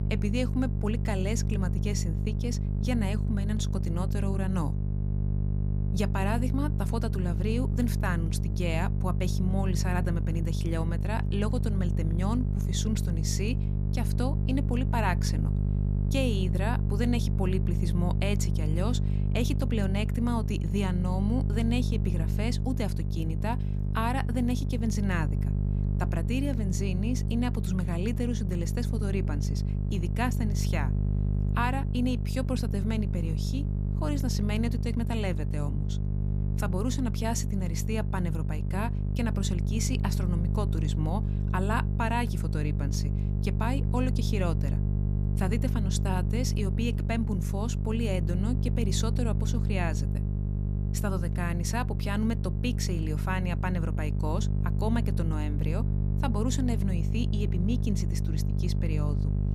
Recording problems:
electrical hum; loud; throughout; 50 Hz, 6 dB below the speech

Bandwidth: 14.5 kHz